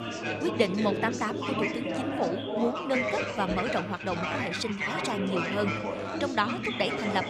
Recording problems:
chatter from many people; loud; throughout; as loud as the speech

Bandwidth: 15 kHz